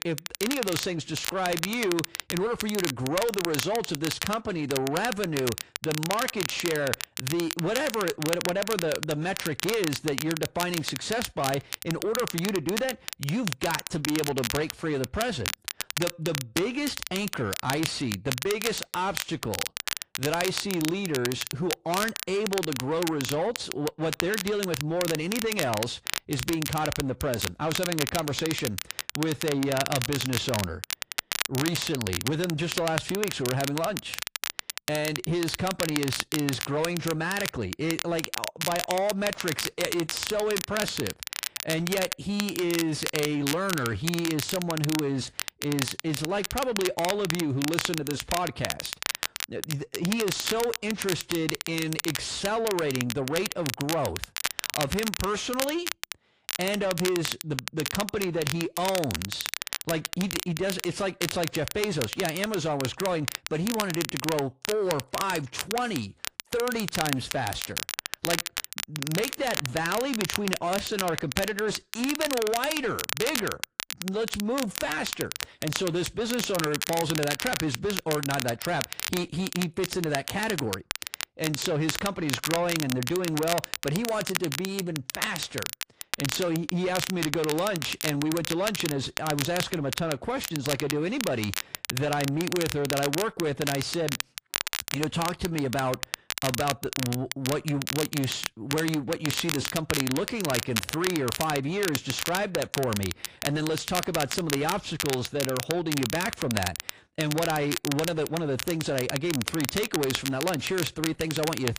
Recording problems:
distortion; slight; 10 dB below the speech
garbled, watery; slightly
crackle, like an old record; loud; 3 dB below the speech

